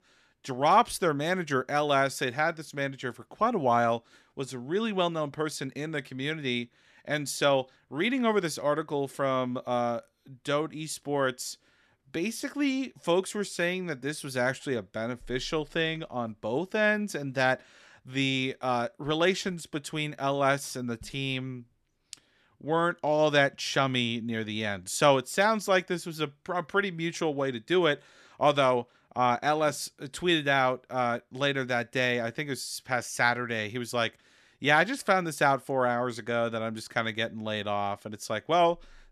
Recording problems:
none

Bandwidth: 13.5 kHz